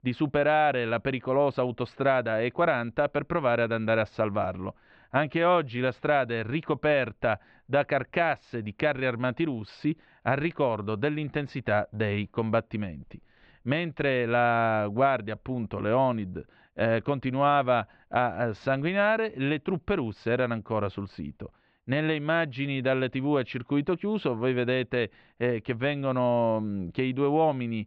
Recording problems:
muffled; very; fading above 3 kHz

